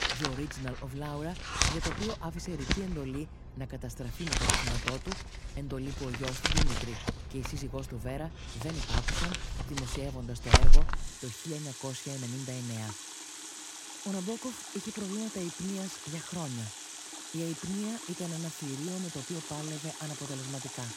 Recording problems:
household noises; very loud; throughout; 4 dB above the speech

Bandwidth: 16 kHz